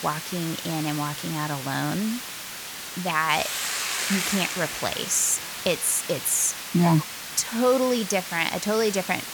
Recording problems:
hiss; loud; throughout; 6 dB below the speech

